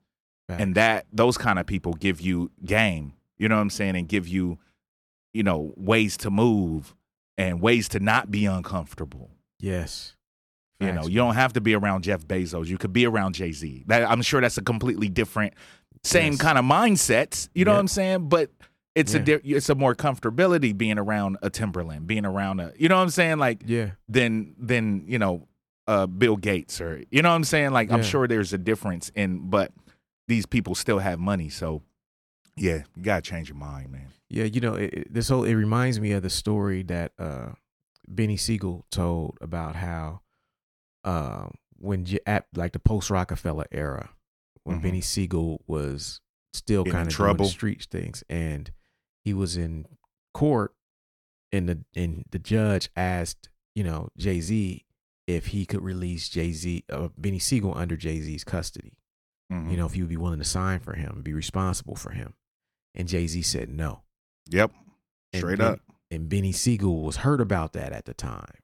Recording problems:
none

